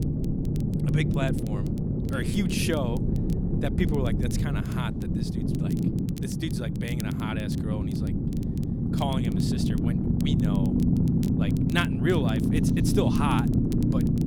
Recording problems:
low rumble; loud; throughout; 1 dB below the speech
crackle, like an old record; noticeable; 20 dB below the speech

